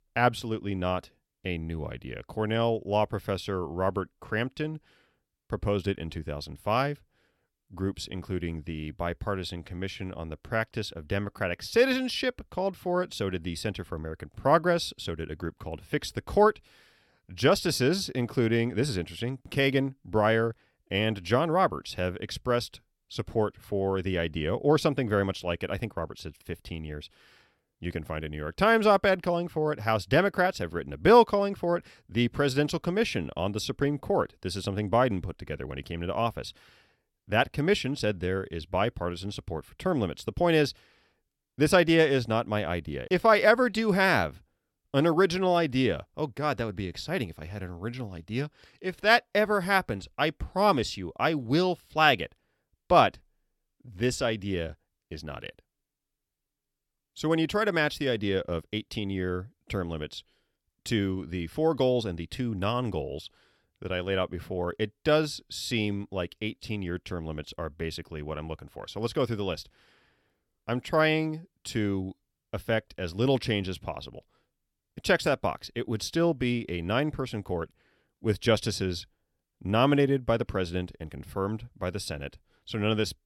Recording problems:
none

